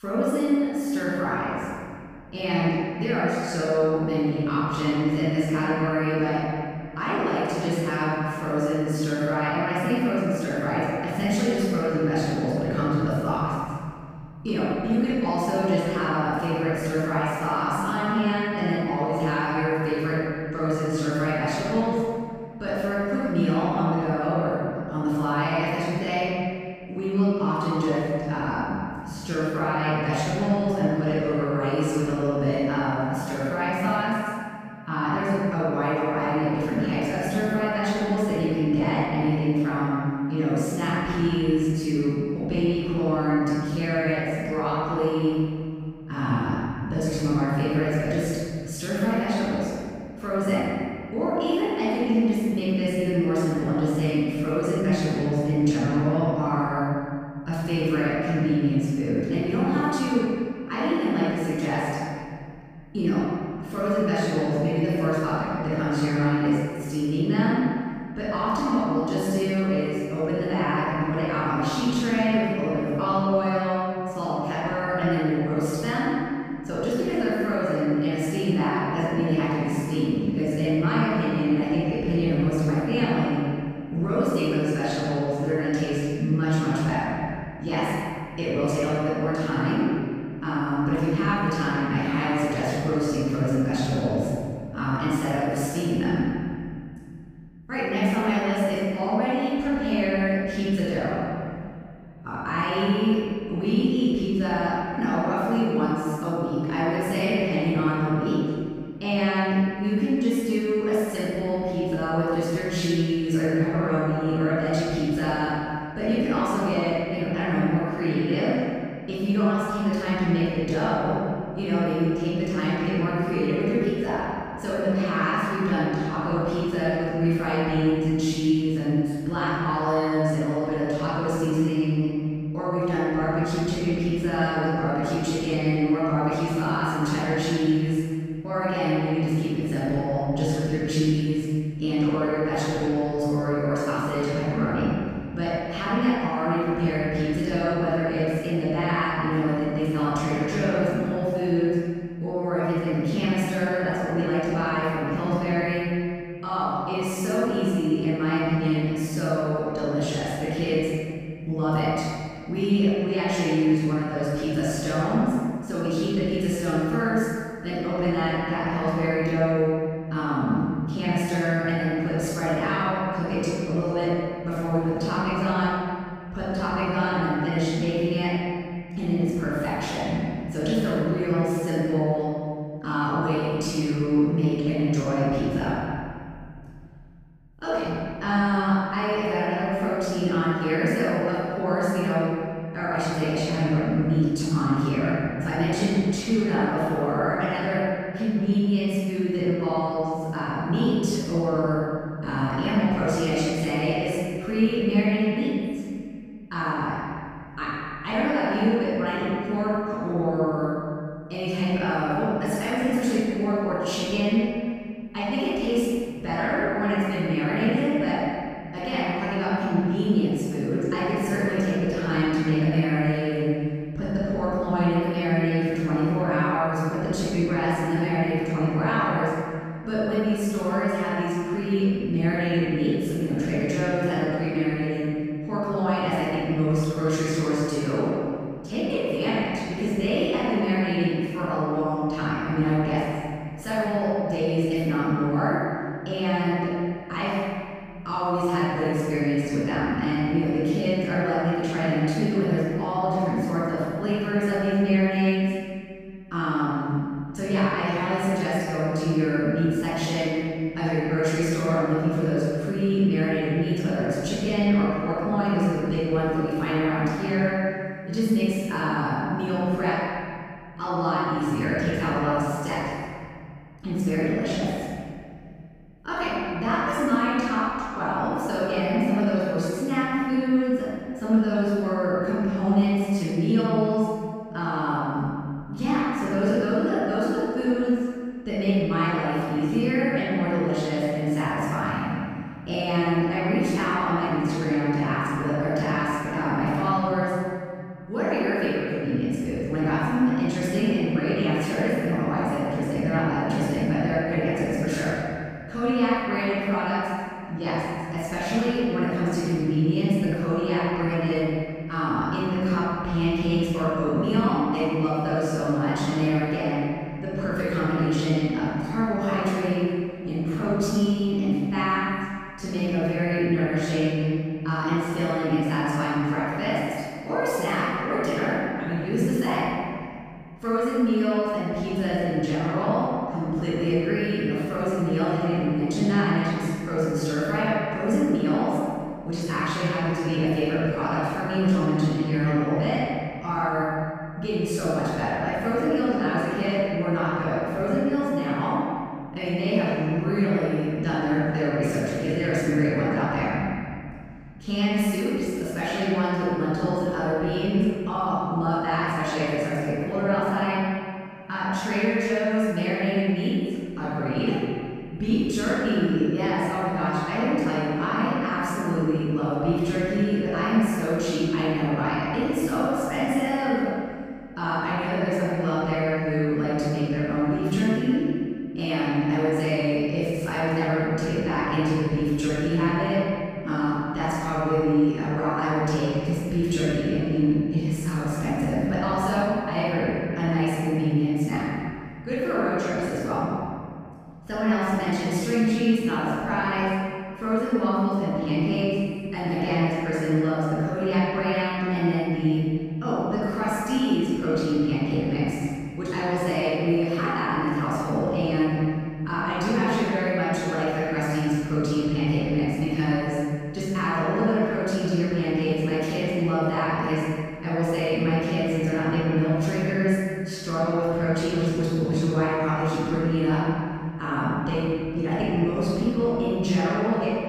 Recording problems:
room echo; strong; dies away in 2.2 s
off-mic speech; far

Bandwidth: 15 kHz